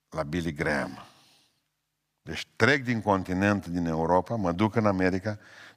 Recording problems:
none

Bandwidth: 15 kHz